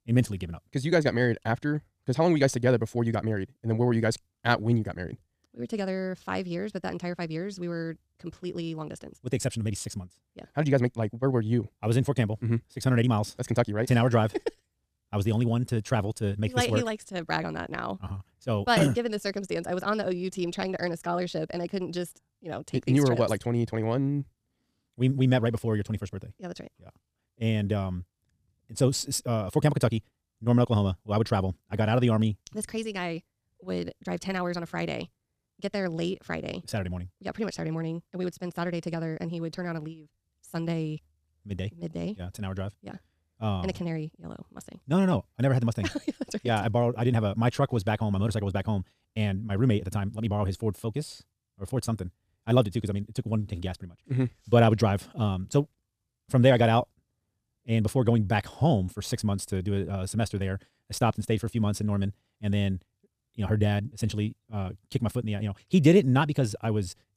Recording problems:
wrong speed, natural pitch; too fast; 1.6 times normal speed

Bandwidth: 14.5 kHz